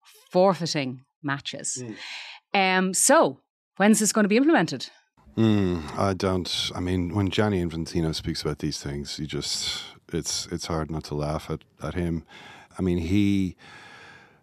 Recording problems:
none

